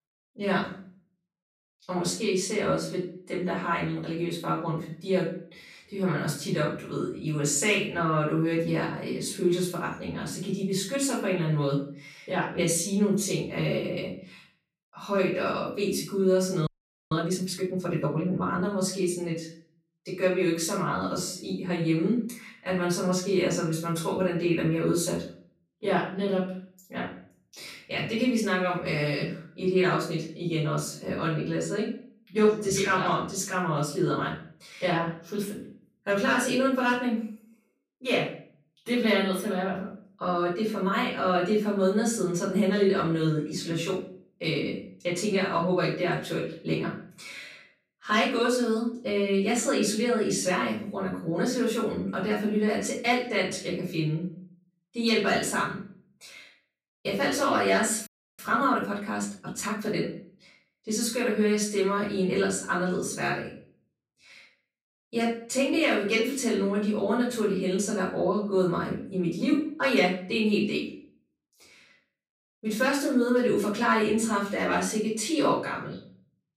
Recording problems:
off-mic speech; far
room echo; noticeable; dies away in 0.4 s
audio freezing; at 17 s and at 58 s

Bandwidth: 14.5 kHz